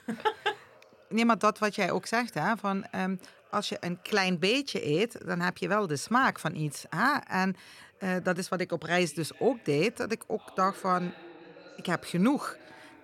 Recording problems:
voice in the background; faint; throughout; 25 dB below the speech

